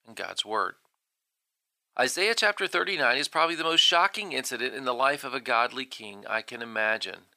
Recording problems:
thin; very; fading below 500 Hz

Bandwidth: 15 kHz